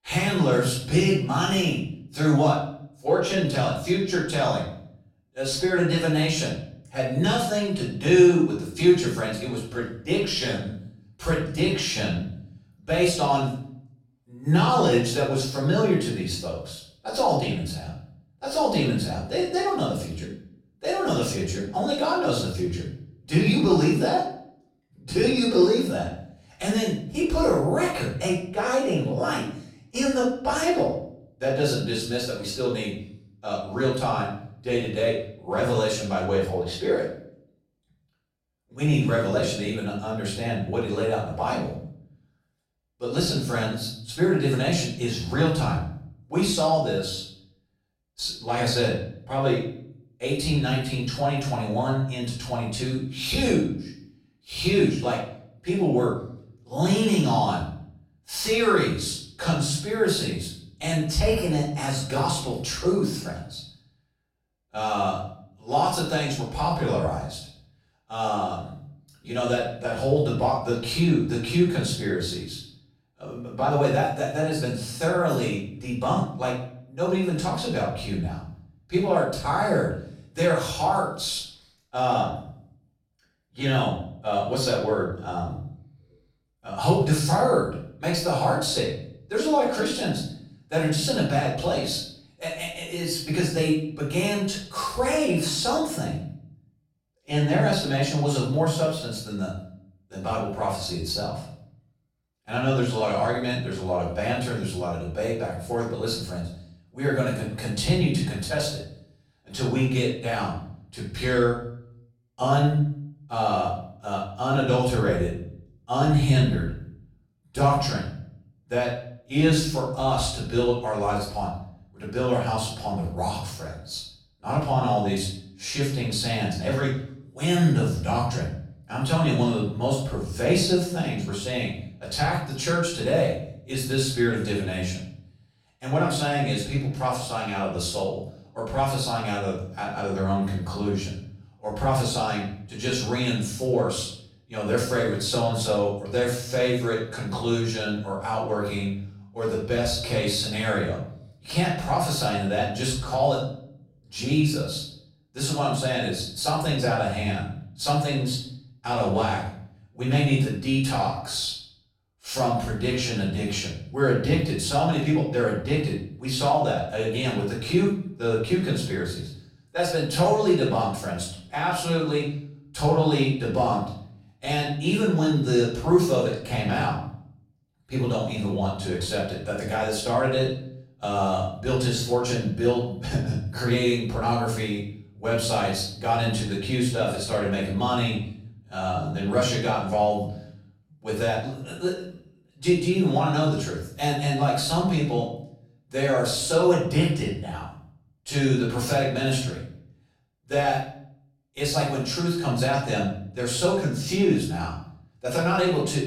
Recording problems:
off-mic speech; far
room echo; noticeable; dies away in 0.5 s

